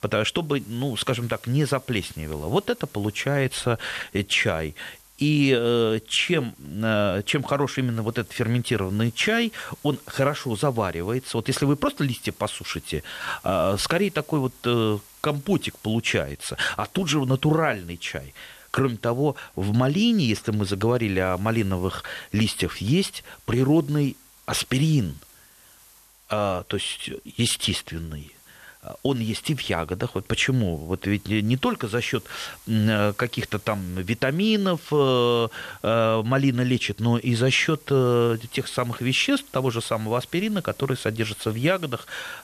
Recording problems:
hiss; faint; throughout; 25 dB below the speech

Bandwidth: 13.5 kHz